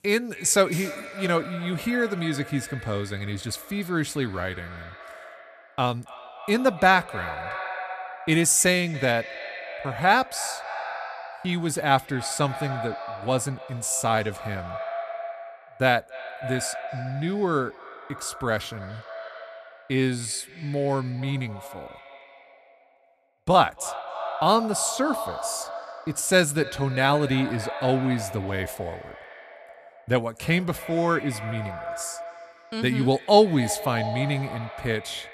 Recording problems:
echo of what is said; strong; throughout; 280 ms later, 10 dB below the speech

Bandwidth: 14.5 kHz